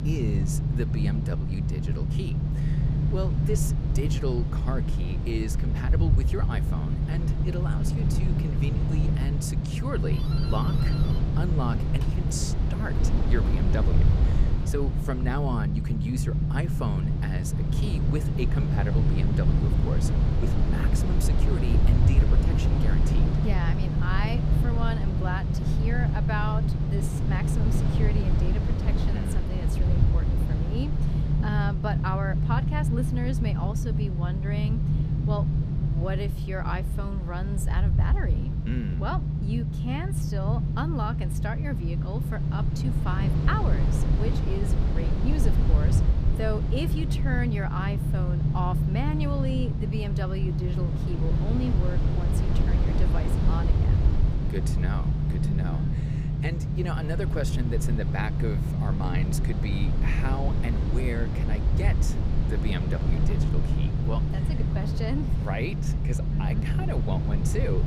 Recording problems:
low rumble; loud; throughout; 1 dB below the speech
doorbell; noticeable; from 10 to 15 s; peak 7 dB below the speech

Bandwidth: 15 kHz